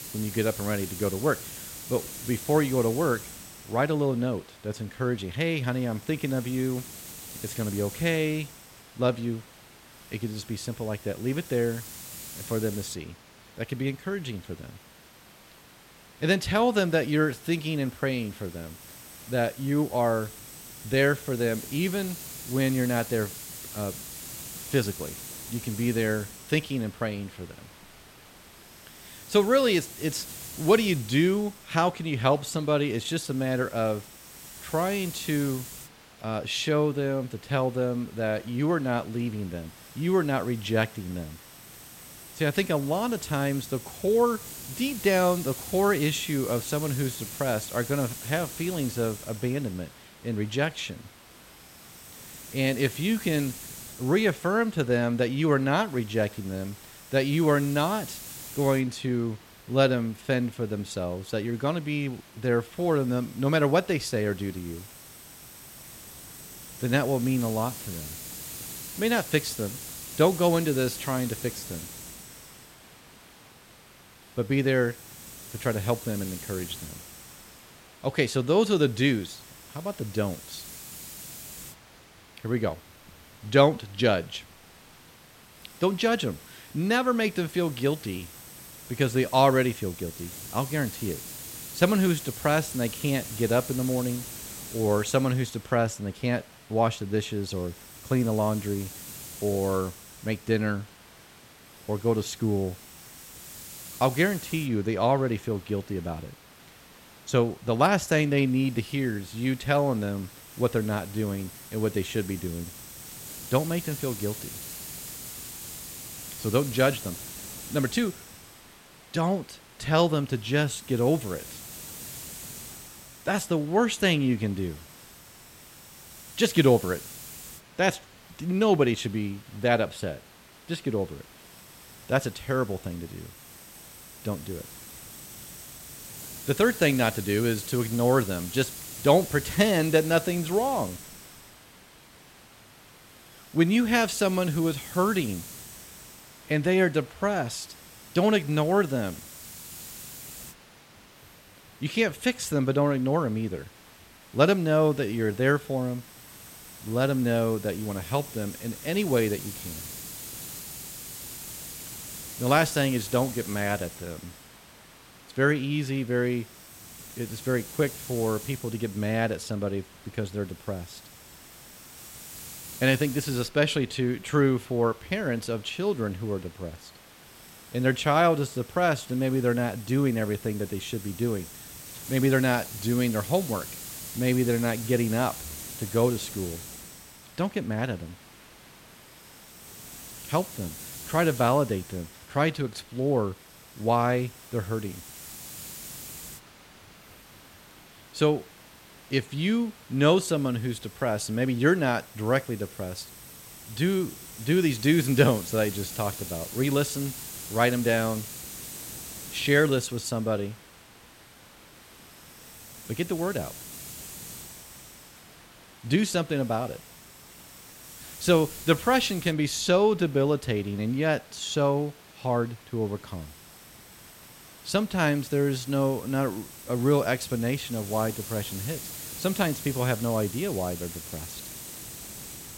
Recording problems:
hiss; noticeable; throughout; 15 dB below the speech

